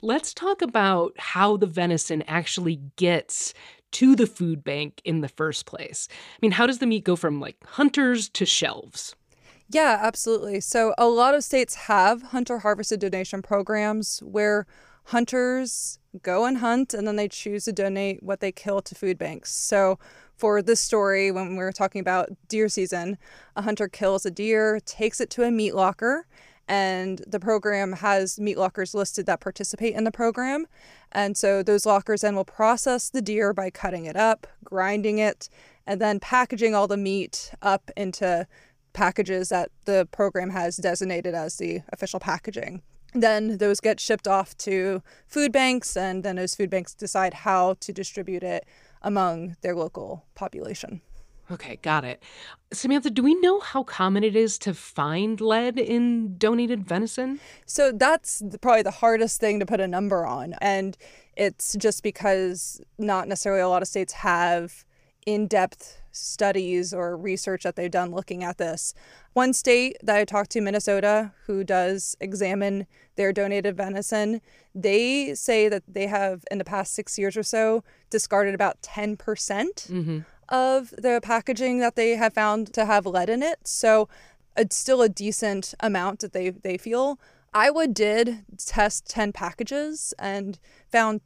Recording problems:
none

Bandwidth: 15 kHz